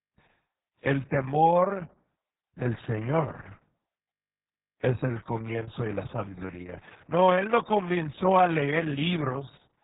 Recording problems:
garbled, watery; badly; nothing above 3.5 kHz
muffled; very slightly; fading above 2 kHz
high frequencies cut off; slight

